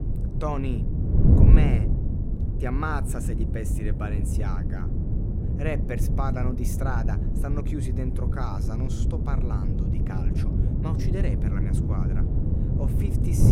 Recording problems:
wind noise on the microphone; heavy; 1 dB below the speech
abrupt cut into speech; at the end

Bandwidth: 16 kHz